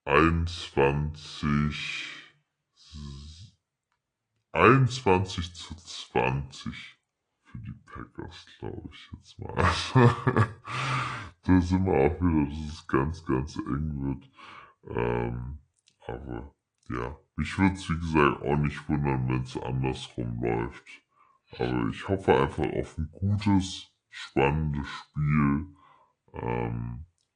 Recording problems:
wrong speed and pitch; too slow and too low; 0.7 times normal speed
garbled, watery; slightly; nothing above 10 kHz

